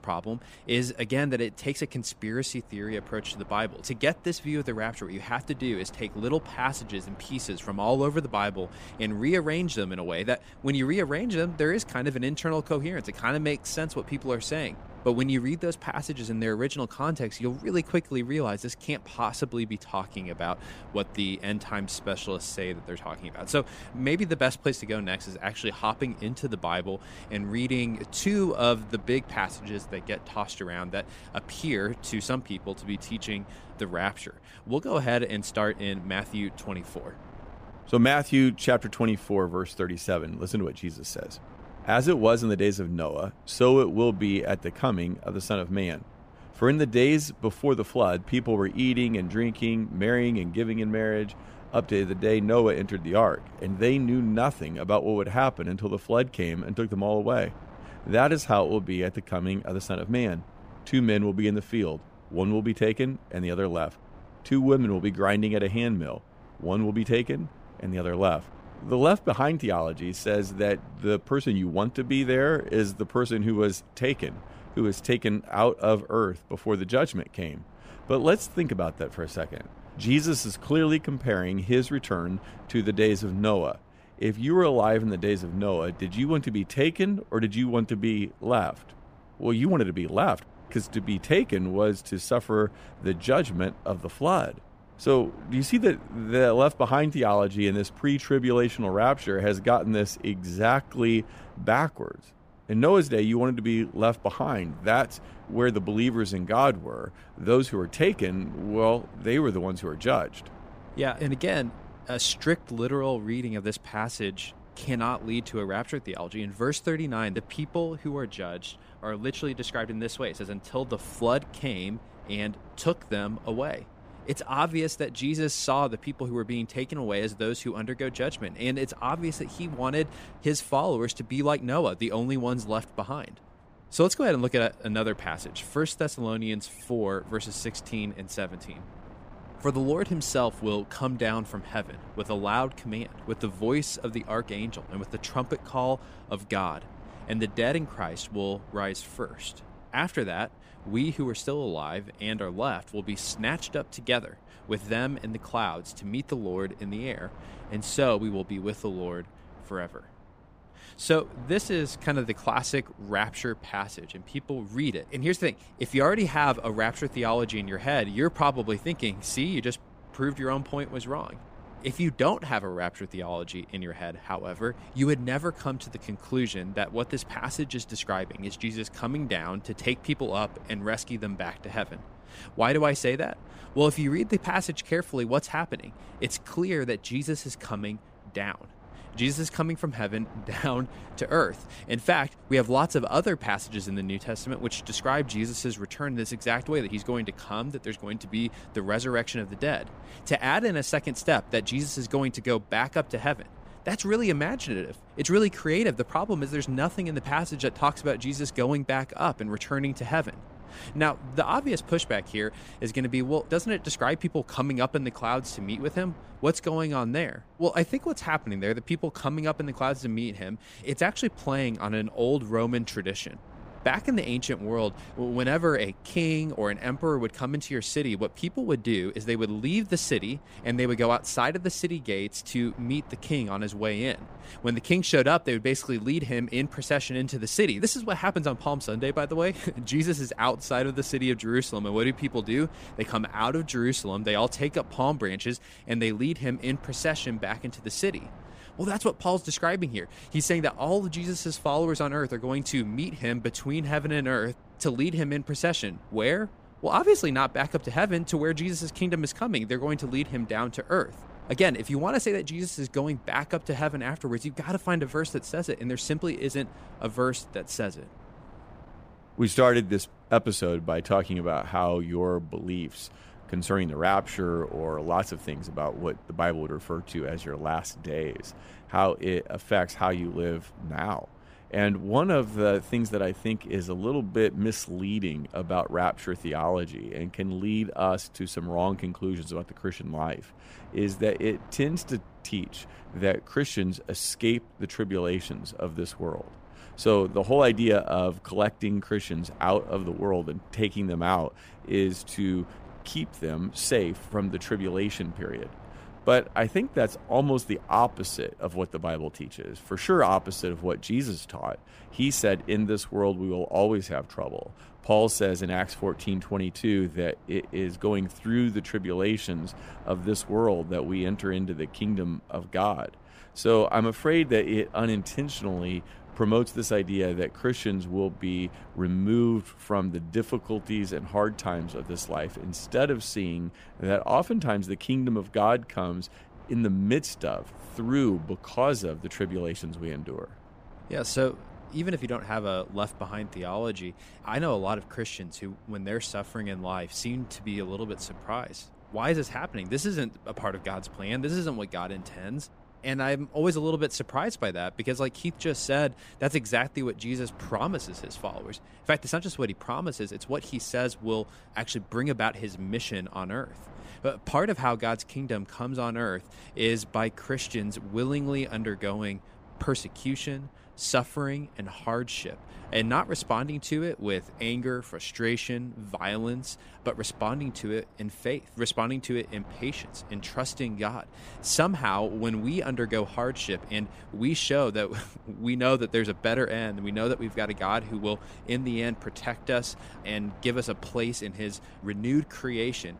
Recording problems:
wind noise on the microphone; occasional gusts; 25 dB below the speech

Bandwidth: 15 kHz